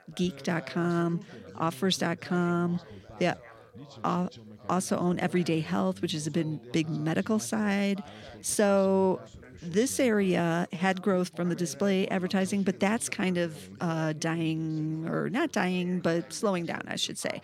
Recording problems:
background chatter; noticeable; throughout; 3 voices, 20 dB below the speech

